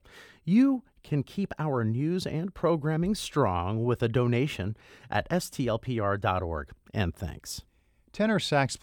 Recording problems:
none

